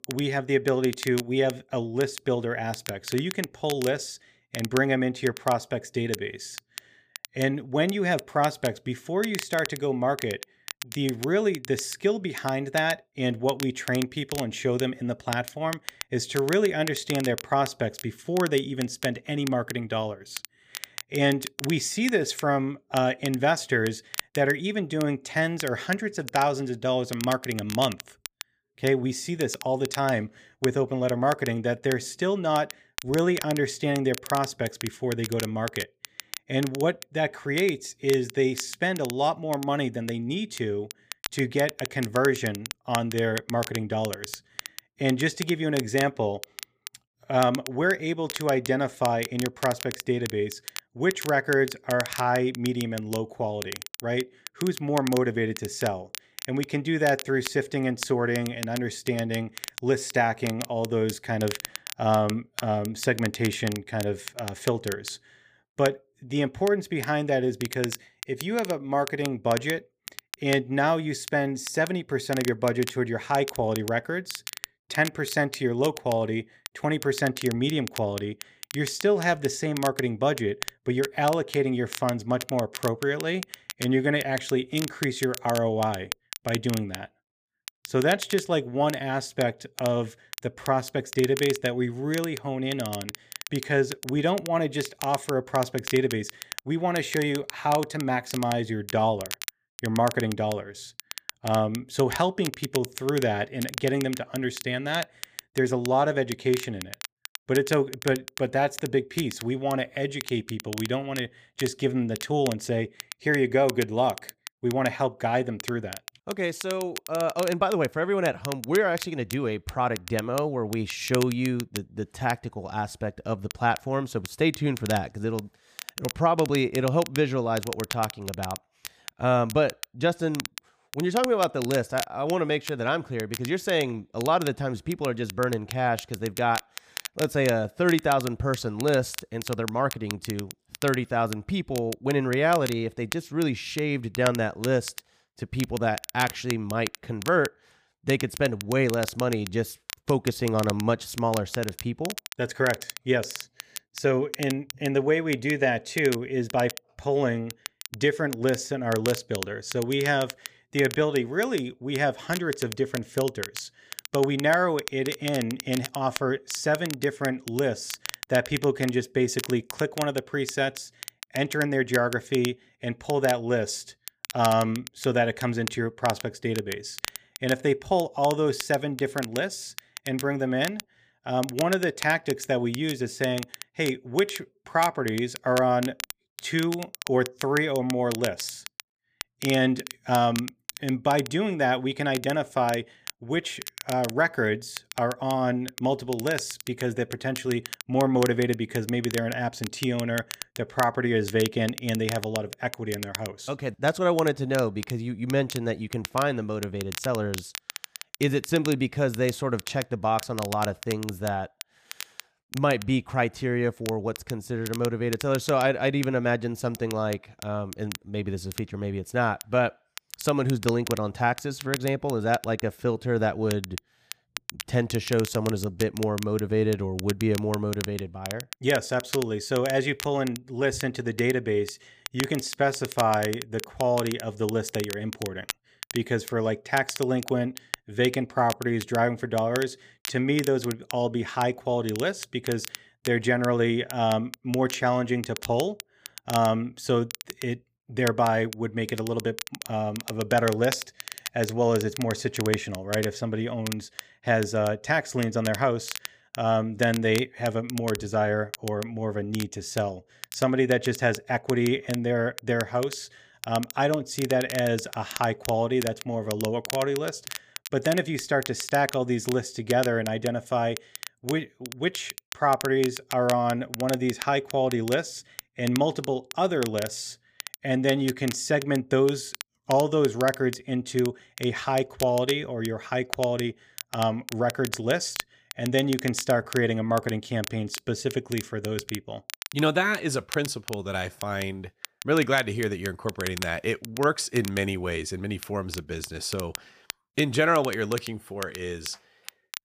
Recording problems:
crackle, like an old record; noticeable; 10 dB below the speech

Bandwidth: 15 kHz